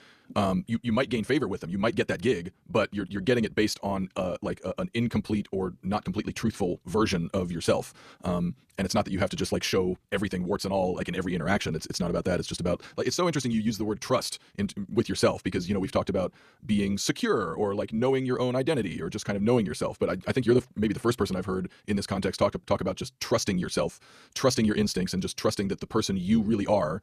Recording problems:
wrong speed, natural pitch; too fast; 1.5 times normal speed

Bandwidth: 14.5 kHz